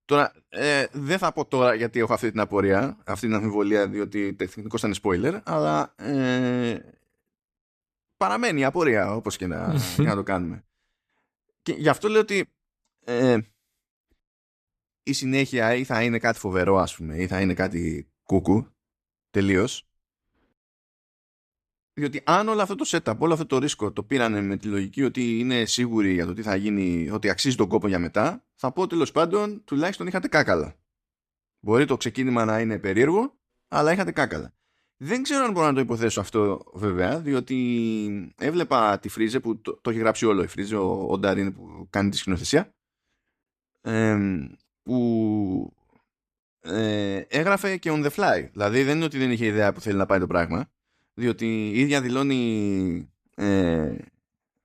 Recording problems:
none

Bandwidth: 14.5 kHz